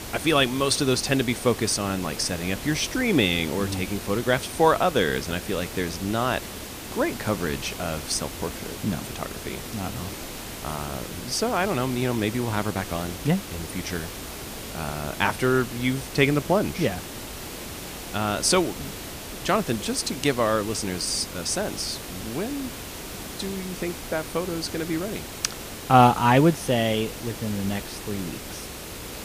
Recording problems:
hiss; loud; throughout; 10 dB below the speech

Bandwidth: 15 kHz